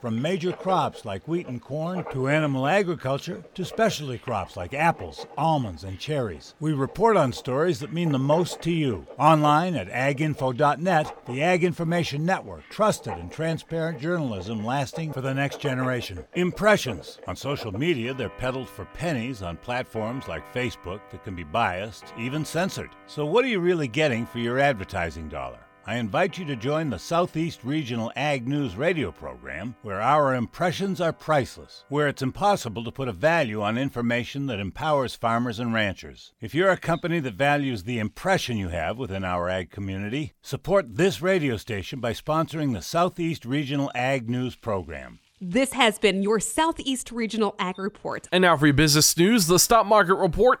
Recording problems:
household noises; noticeable; throughout; 20 dB below the speech

